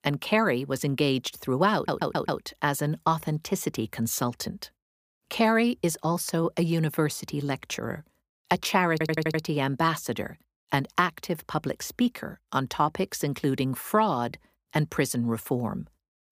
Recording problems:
audio stuttering; at 2 s and at 9 s

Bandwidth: 15 kHz